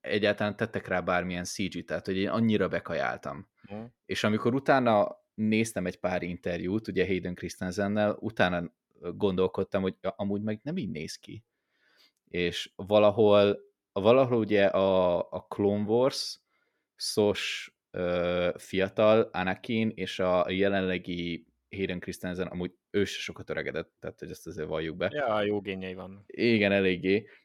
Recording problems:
none

